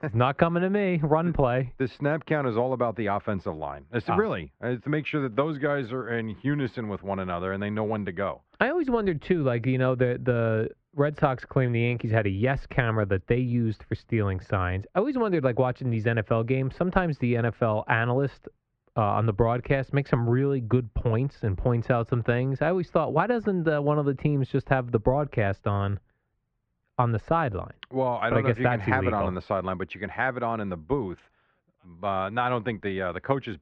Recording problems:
muffled; very; fading above 2 kHz

